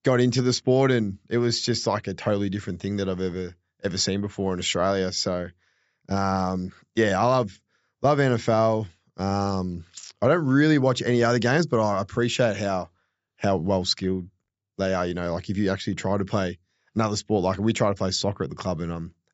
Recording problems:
high frequencies cut off; noticeable; nothing above 8 kHz

